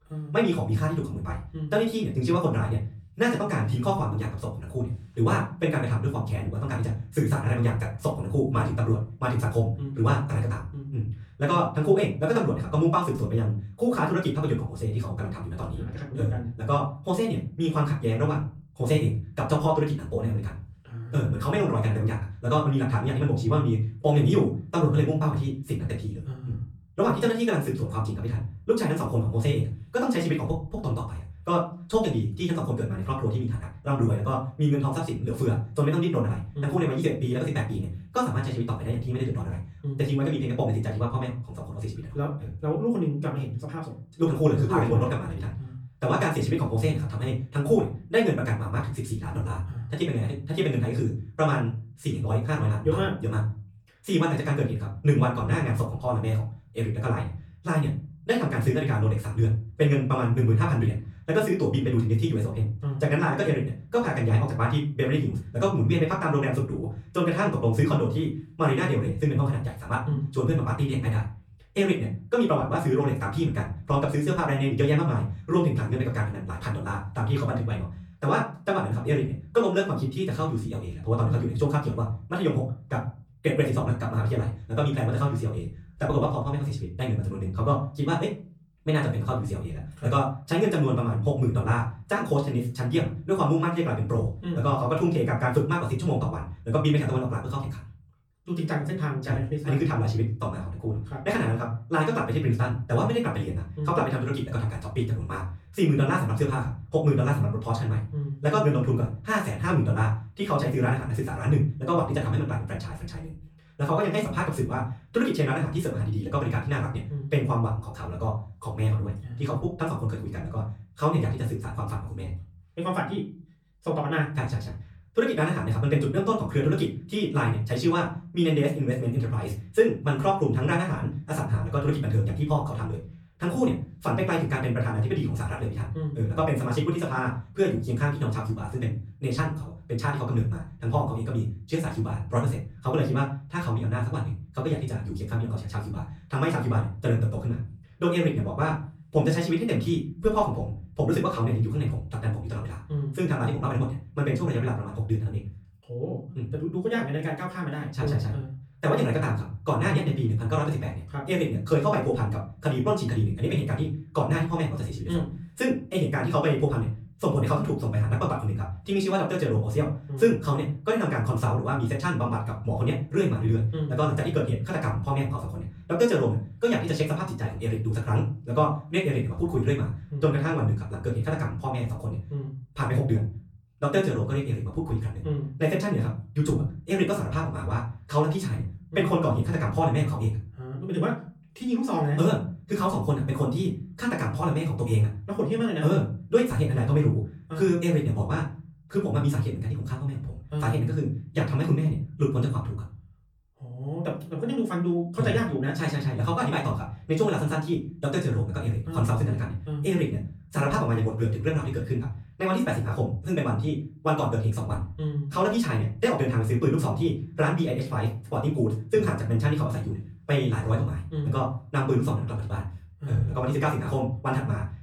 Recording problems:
off-mic speech; far
wrong speed, natural pitch; too fast; 1.7 times normal speed
room echo; slight; dies away in 0.4 s

